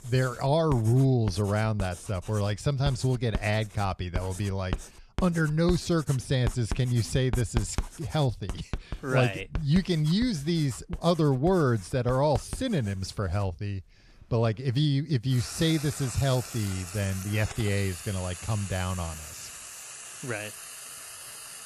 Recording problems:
household noises; noticeable; throughout; 10 dB below the speech

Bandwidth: 14 kHz